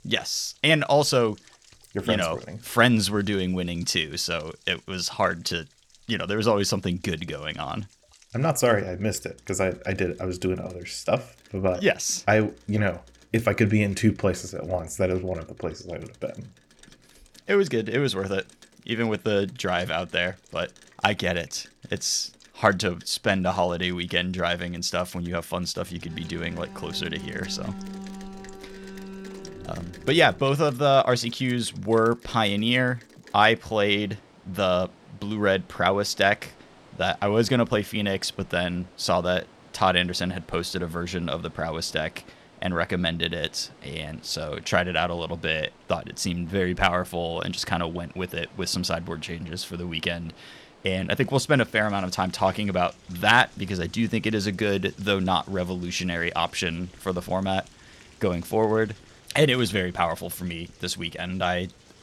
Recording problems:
rain or running water; faint; throughout; 25 dB below the speech
alarm; faint; from 26 to 30 s; peak 10 dB below the speech

